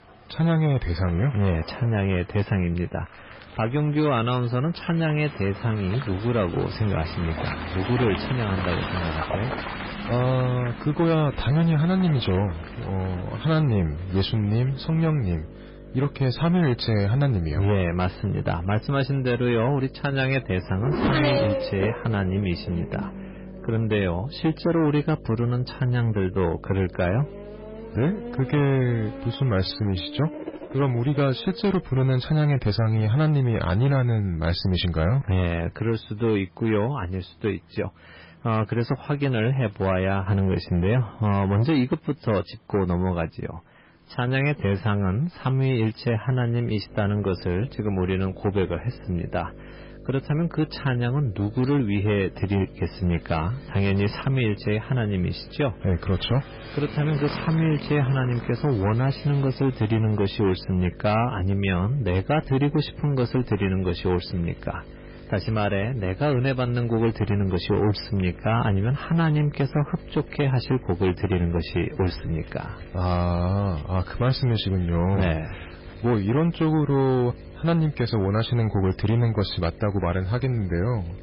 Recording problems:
garbled, watery; badly; nothing above 5 kHz
distortion; slight; 9% of the sound clipped
traffic noise; noticeable; throughout; 10 dB below the speech
electrical hum; faint; from 6 to 29 s and from 47 s on; 50 Hz, 20 dB below the speech
crackling; faint; from 1:14 to 1:16; 30 dB below the speech

